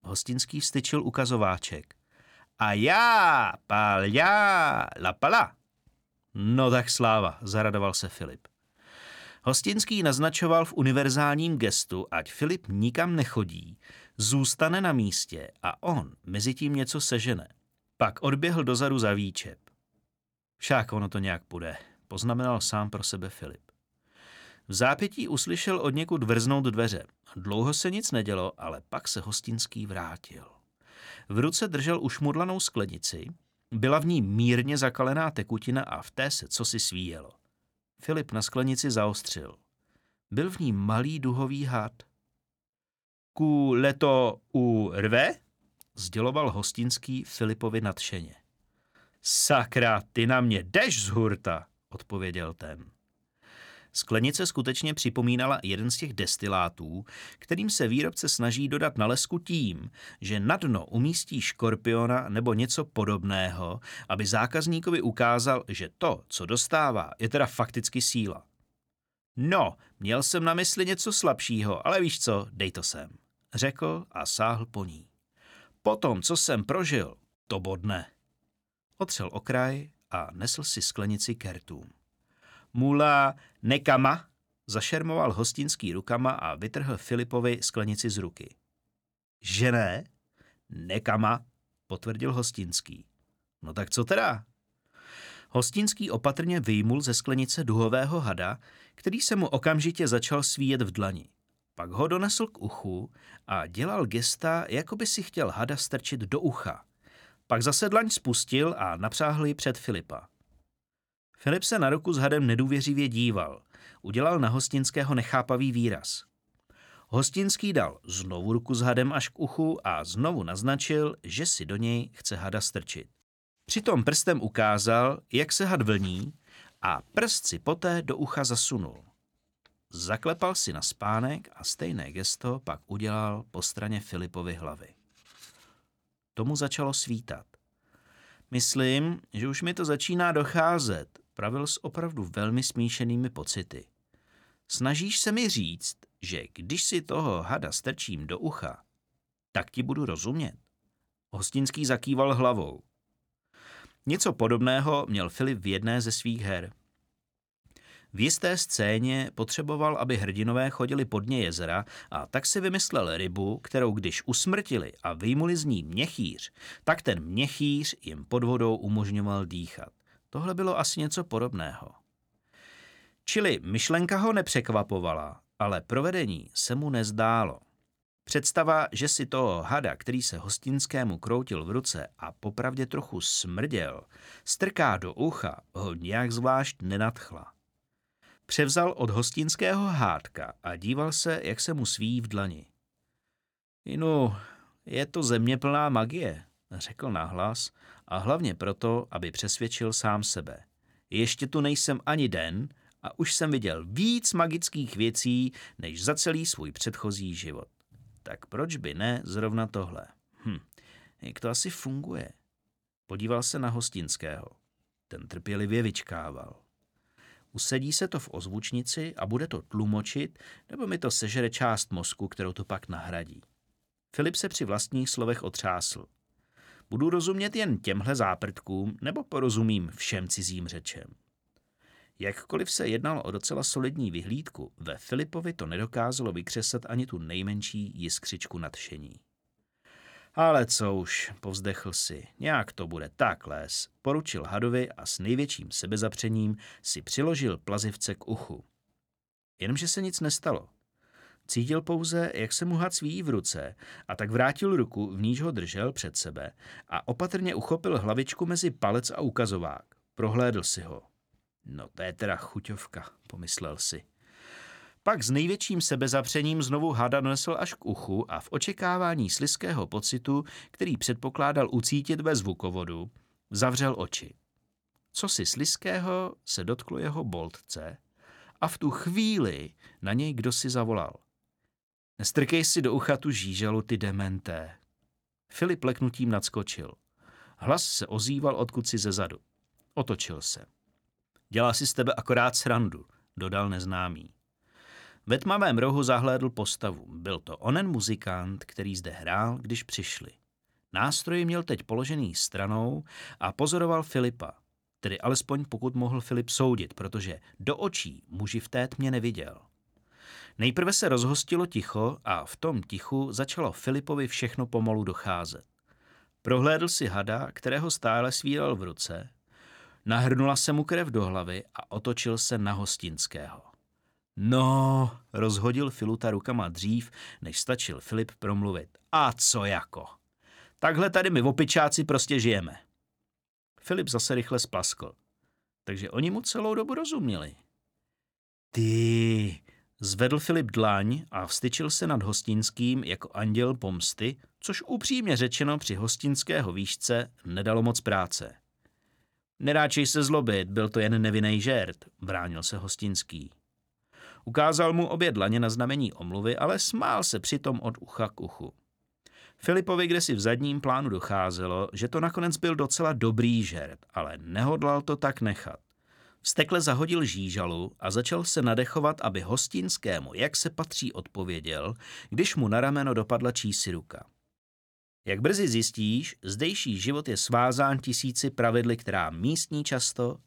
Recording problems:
none

